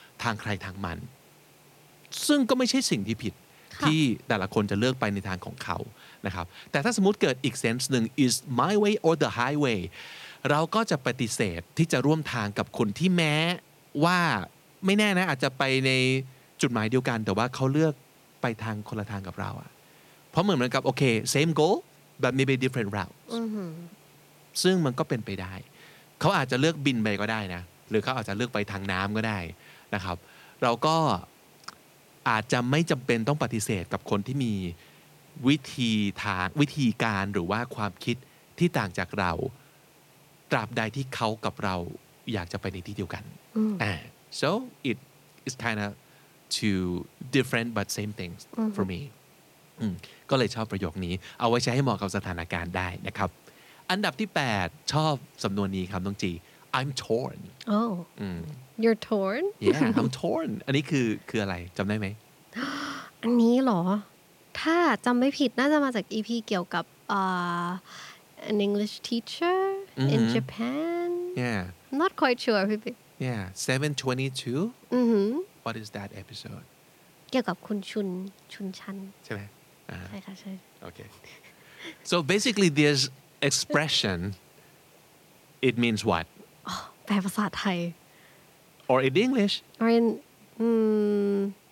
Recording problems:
hiss; faint; throughout; 30 dB below the speech

